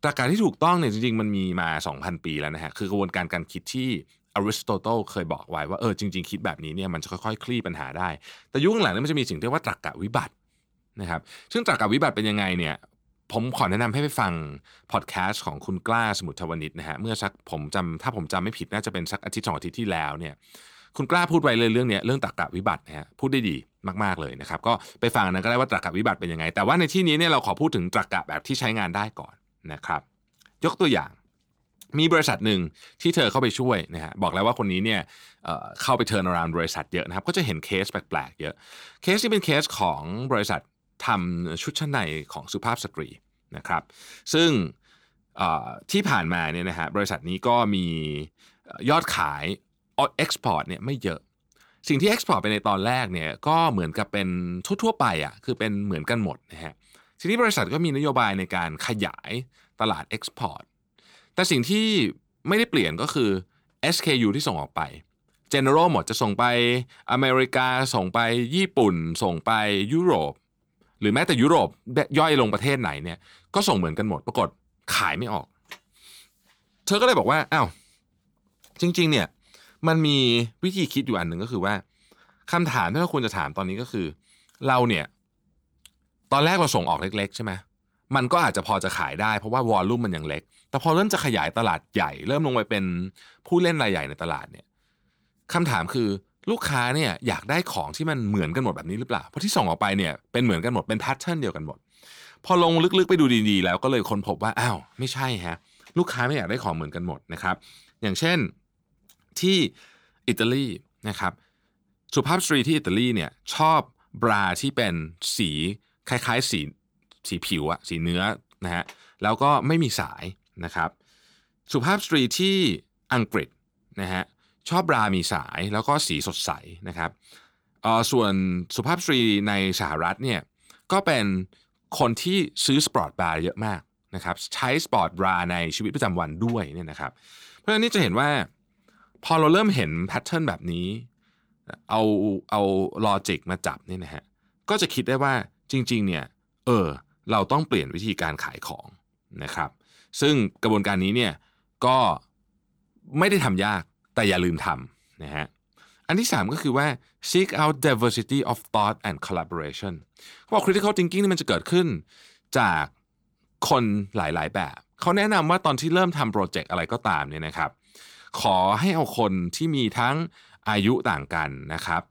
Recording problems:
none

